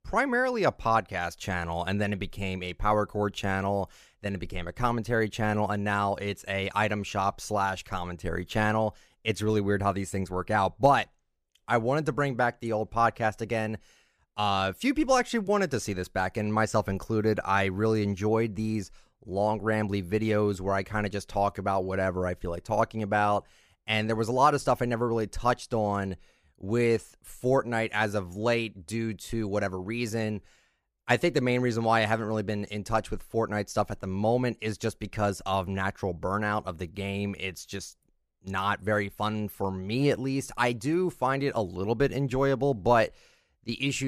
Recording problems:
abrupt cut into speech; at the end

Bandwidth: 15 kHz